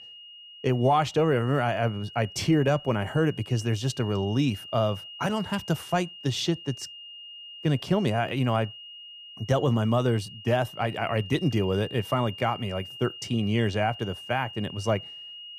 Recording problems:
high-pitched whine; noticeable; throughout; 3 kHz, 15 dB below the speech

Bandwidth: 15 kHz